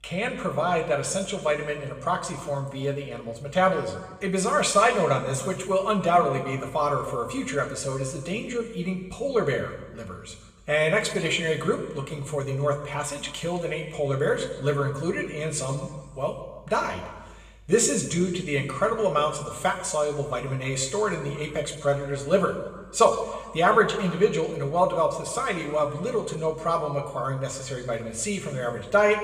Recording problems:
room echo; slight; dies away in 1.1 s
off-mic speech; somewhat distant

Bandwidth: 14.5 kHz